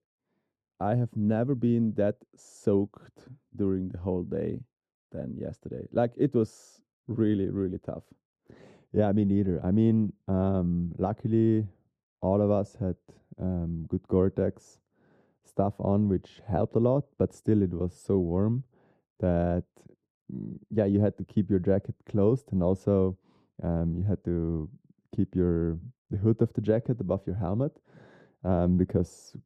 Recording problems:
muffled; very; fading above 1 kHz

